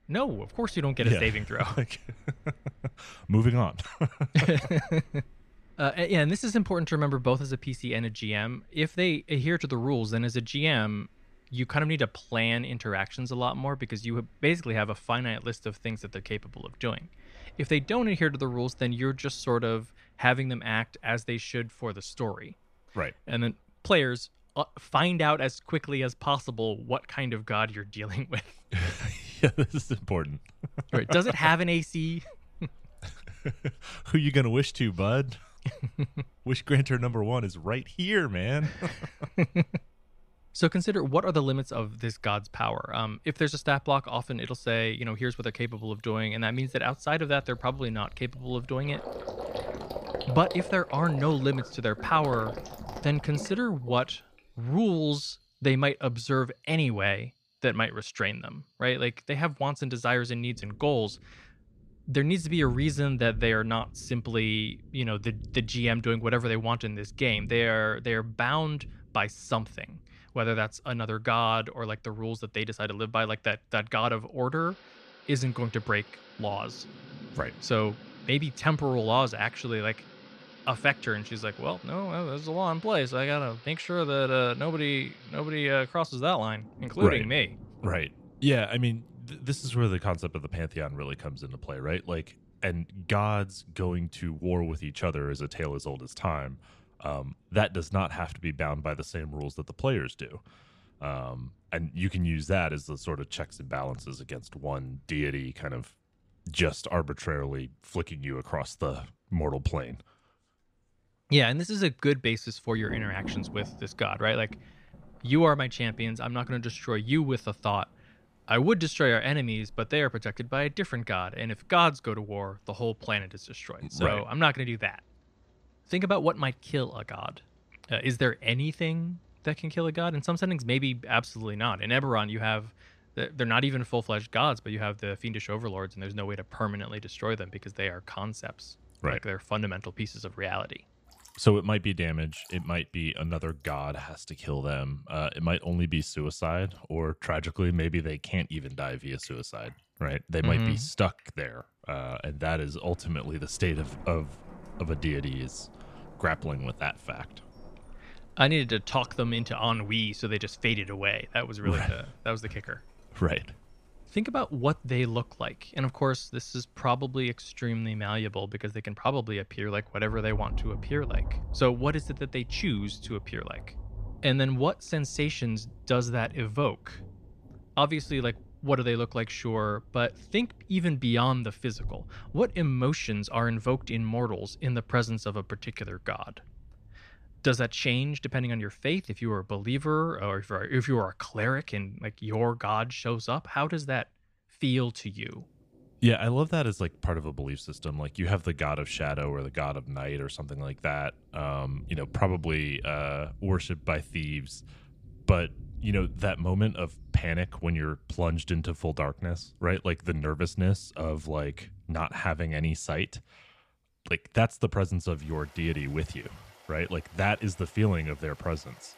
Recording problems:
rain or running water; noticeable; throughout; 15 dB below the speech

